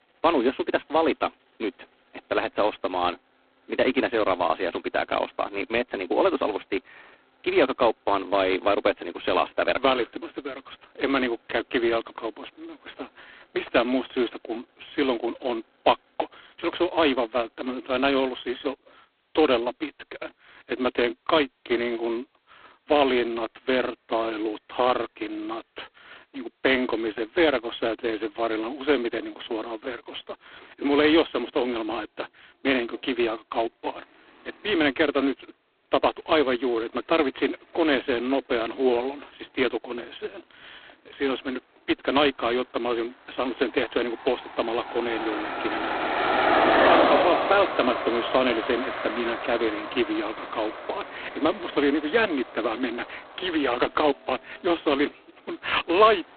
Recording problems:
phone-call audio; poor line; nothing above 4 kHz
traffic noise; loud; throughout; 1 dB below the speech

